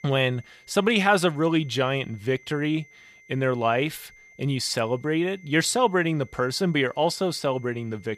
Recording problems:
high-pitched whine; faint; throughout; 2 kHz, 25 dB below the speech

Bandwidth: 15 kHz